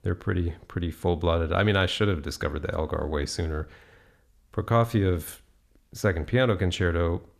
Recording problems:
none

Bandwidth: 14.5 kHz